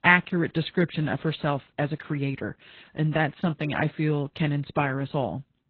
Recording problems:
garbled, watery; badly

